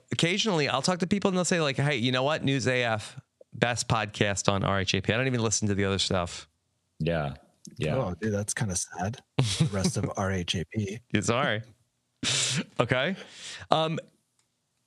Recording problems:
squashed, flat; somewhat

